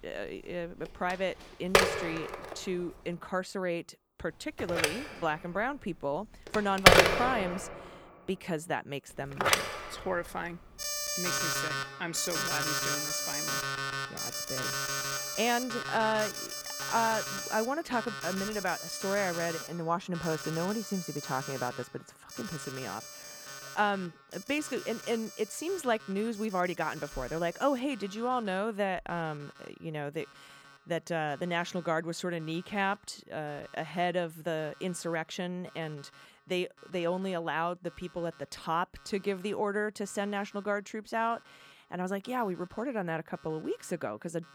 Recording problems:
alarms or sirens; very loud; throughout; 3 dB above the speech

